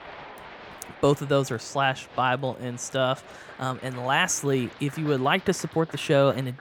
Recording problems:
crowd noise; noticeable; throughout; 20 dB below the speech

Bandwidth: 17.5 kHz